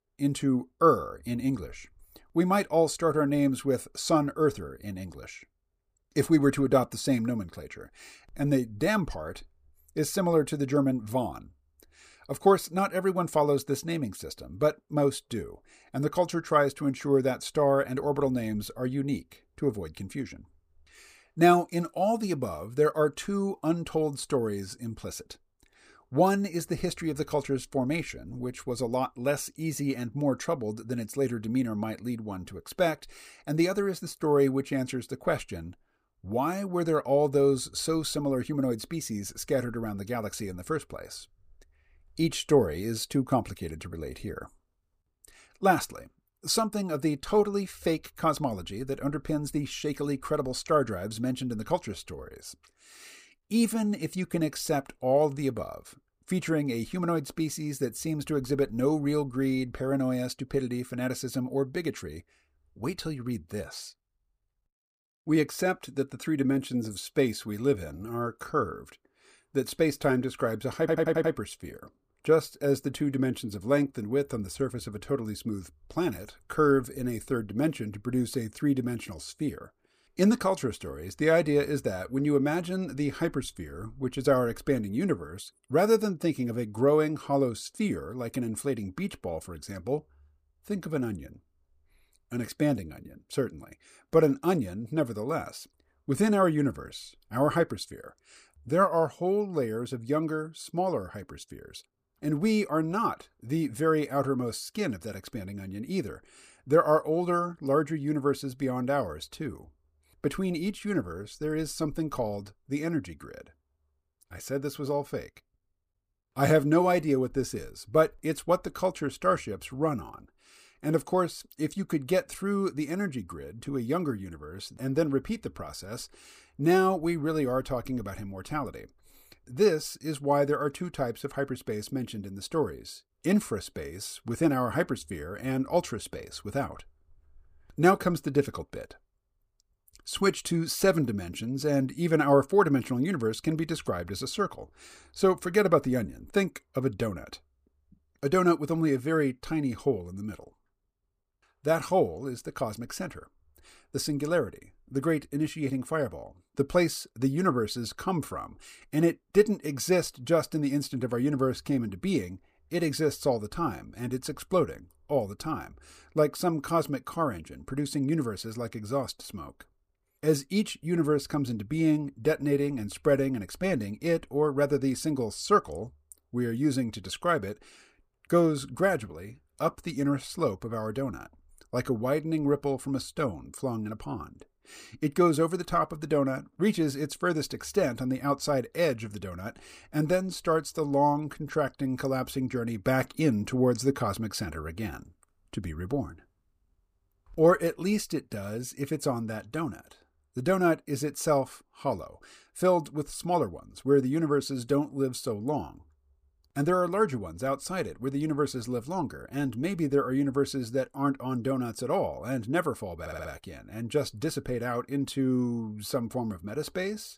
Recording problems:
audio stuttering; at 1:11 and at 3:33

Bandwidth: 15 kHz